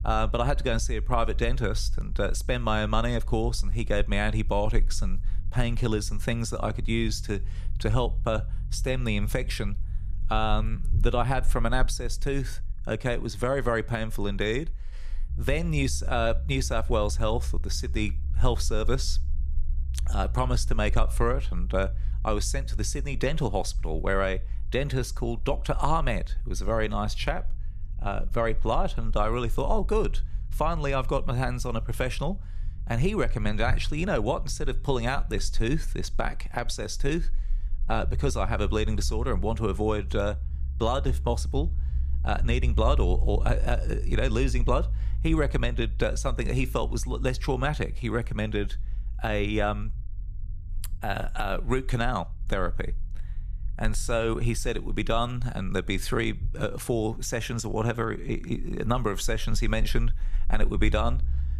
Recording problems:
low rumble; faint; throughout; 25 dB below the speech

